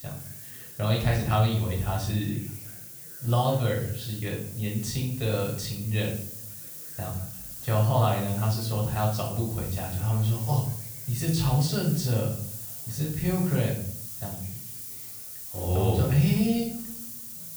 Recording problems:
off-mic speech; far
room echo; noticeable; dies away in 0.5 s
hiss; loud; throughout; 10 dB below the speech
voice in the background; faint; throughout; 30 dB below the speech

